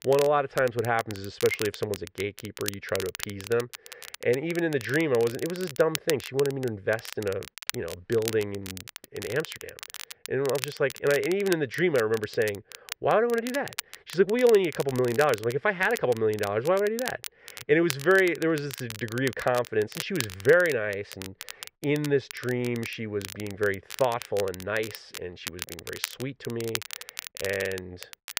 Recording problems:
muffled; very; fading above 2 kHz
crackle, like an old record; noticeable; 10 dB below the speech

